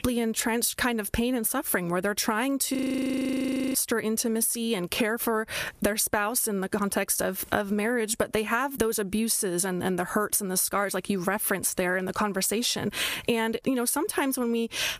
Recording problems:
squashed, flat; heavily
audio freezing; at 3 s for 1 s

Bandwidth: 15 kHz